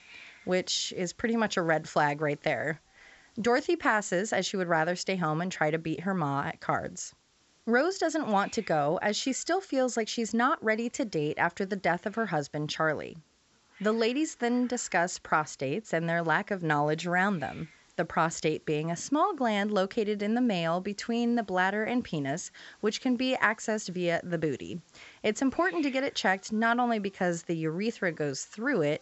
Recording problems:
high frequencies cut off; noticeable; nothing above 7.5 kHz
hiss; faint; throughout; 30 dB below the speech

